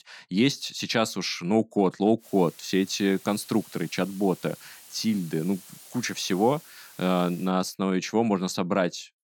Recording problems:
hiss; faint; from 2 to 7.5 s; 20 dB below the speech

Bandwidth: 17 kHz